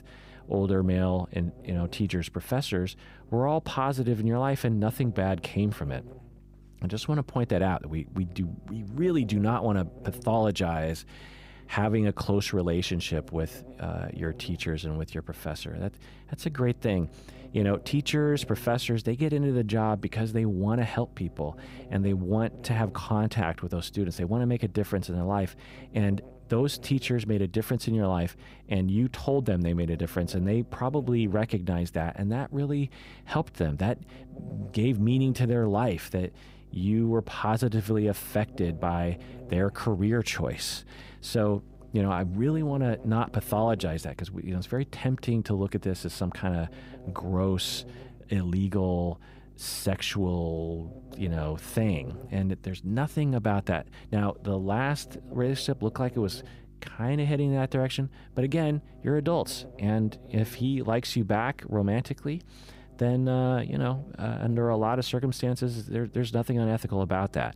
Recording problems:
electrical hum; faint; throughout; 50 Hz, 20 dB below the speech

